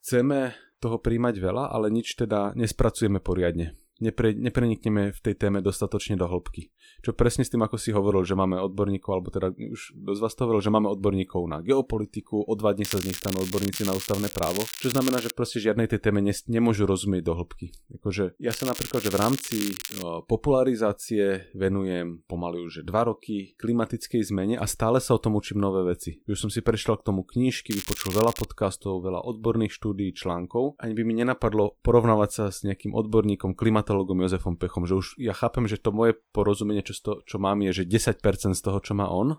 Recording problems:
crackling; loud; from 13 to 15 s, from 19 to 20 s and at 28 s; 7 dB below the speech

